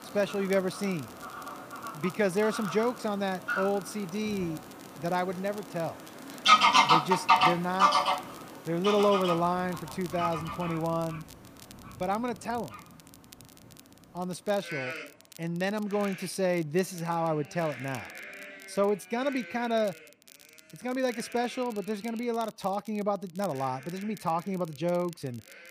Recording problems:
animal sounds; very loud; throughout; 3 dB above the speech
crackle, like an old record; faint; 20 dB below the speech

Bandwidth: 15 kHz